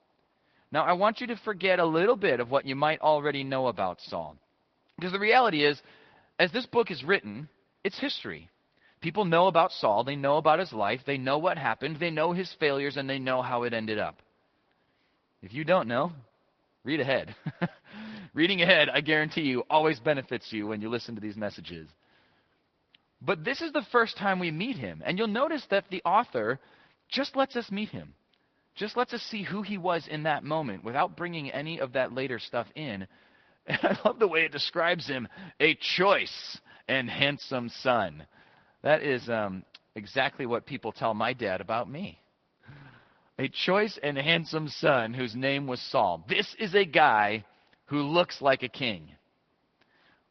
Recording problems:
high frequencies cut off; noticeable; nothing above 5.5 kHz
garbled, watery; slightly

